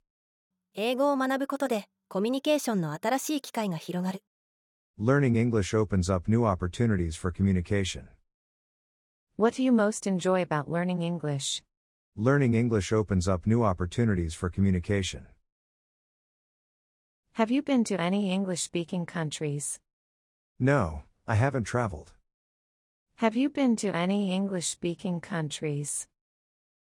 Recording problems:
none

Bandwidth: 17 kHz